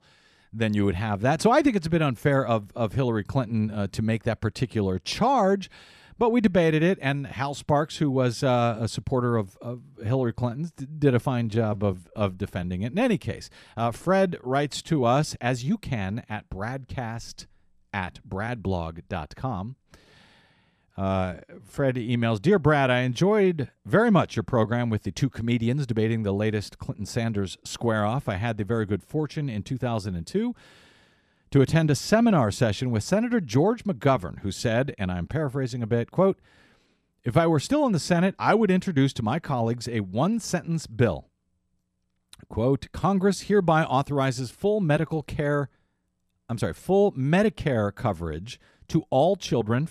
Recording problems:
uneven, jittery; strongly; from 10 to 22 s

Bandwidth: 14 kHz